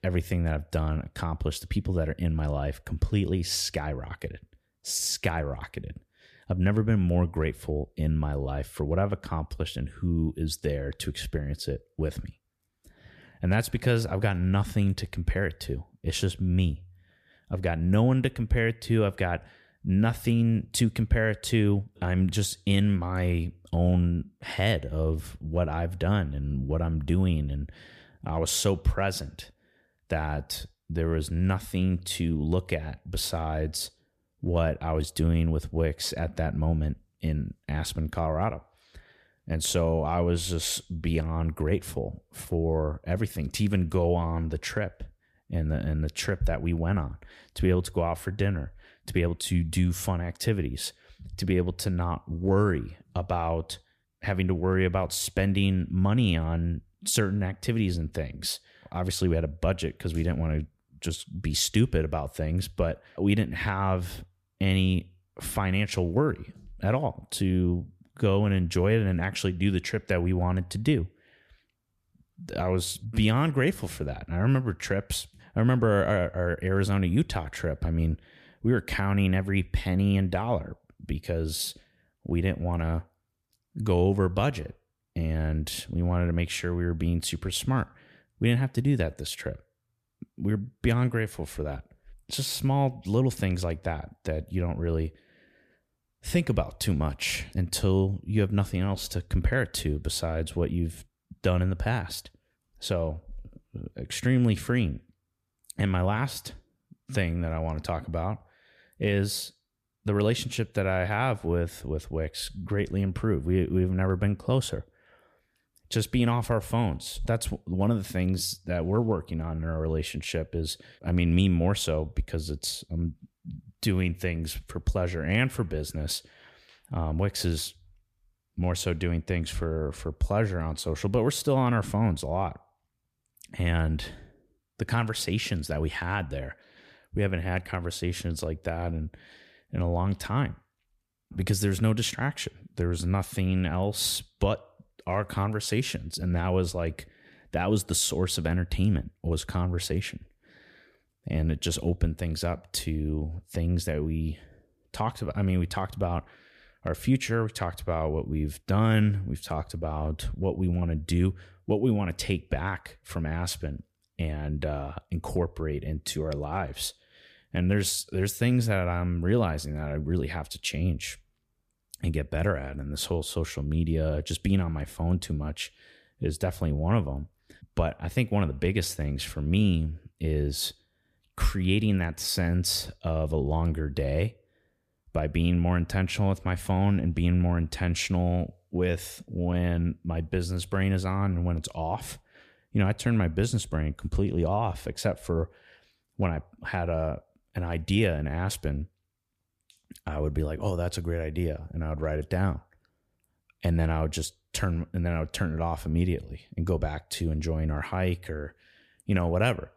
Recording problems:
none

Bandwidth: 14.5 kHz